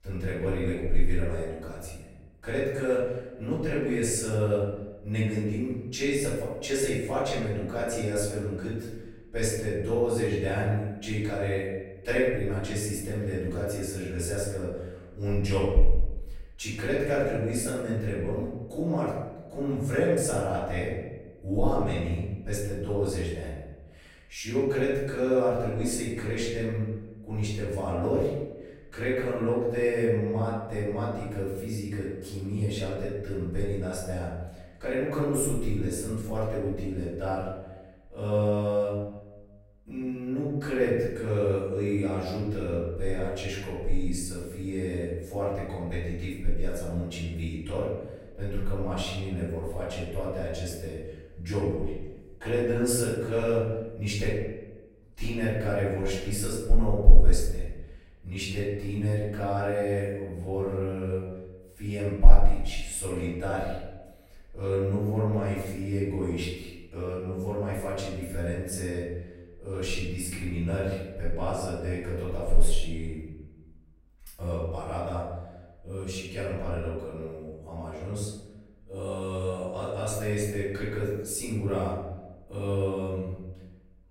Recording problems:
off-mic speech; far
room echo; noticeable; dies away in 0.9 s

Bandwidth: 16 kHz